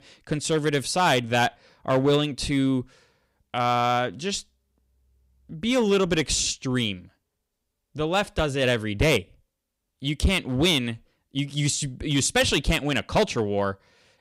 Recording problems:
distortion; slight; 3% of the sound clipped

